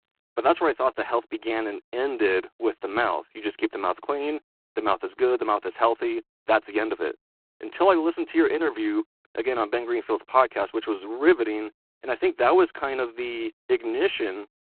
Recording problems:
phone-call audio; poor line; nothing above 3.5 kHz

